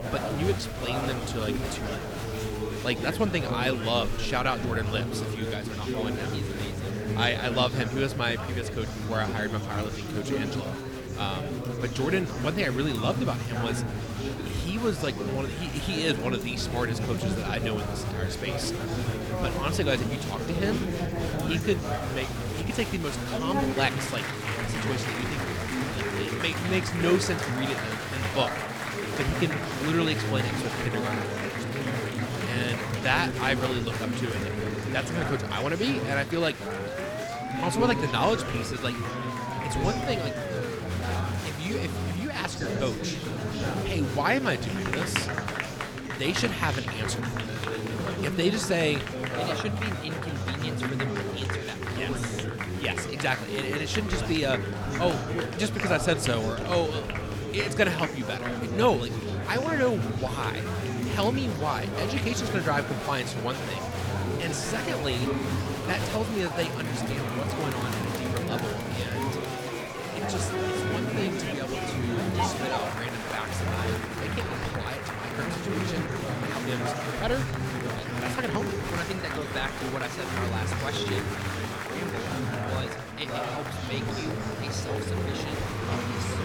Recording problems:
chatter from many people; loud; throughout; as loud as the speech
siren; noticeable; from 37 to 41 s; peak 4 dB below the speech

